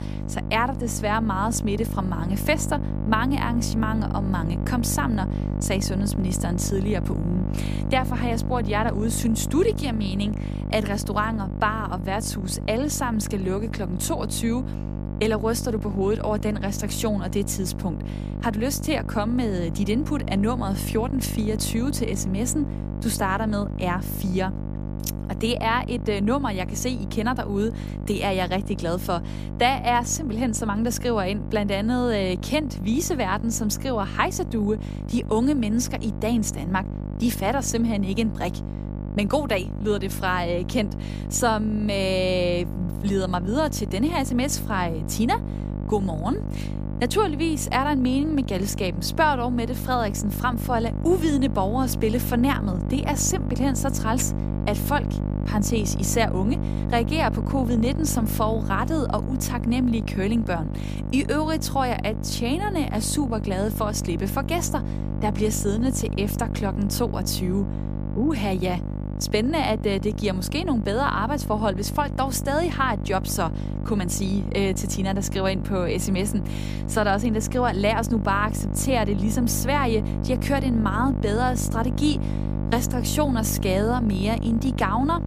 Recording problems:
electrical hum; noticeable; throughout; 50 Hz, 10 dB below the speech

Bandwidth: 15 kHz